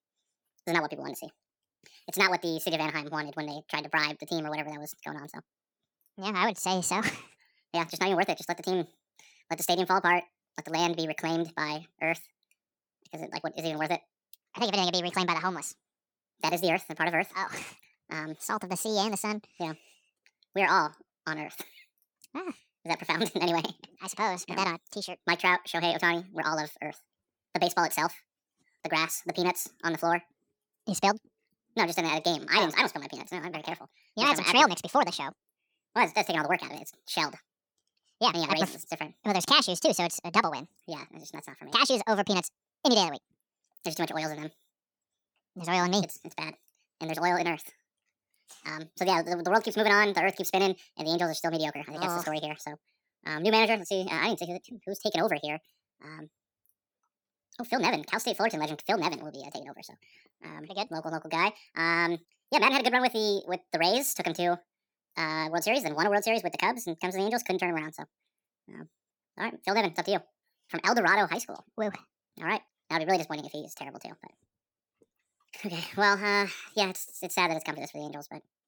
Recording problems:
wrong speed and pitch; too fast and too high; 1.6 times normal speed

